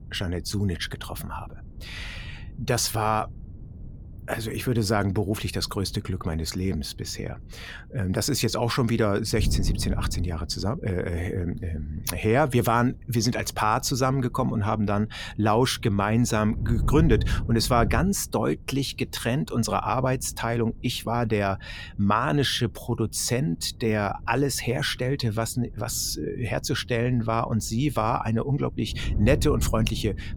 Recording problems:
wind noise on the microphone; occasional gusts; 20 dB below the speech

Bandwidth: 18 kHz